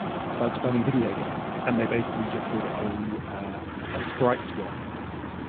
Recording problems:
phone-call audio; poor line; nothing above 3.5 kHz
traffic noise; loud; throughout; 3 dB below the speech

